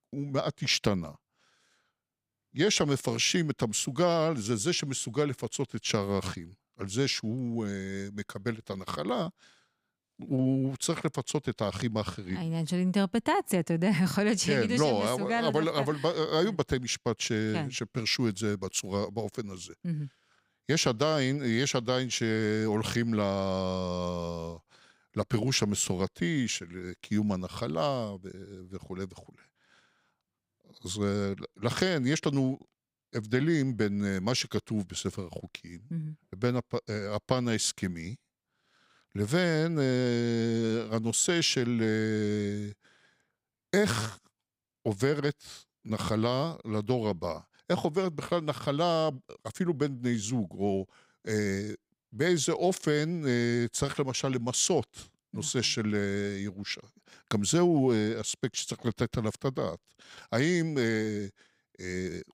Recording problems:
none

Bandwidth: 15.5 kHz